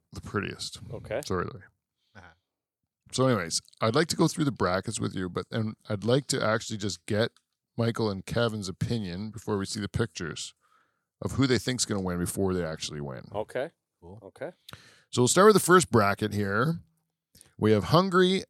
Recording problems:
none

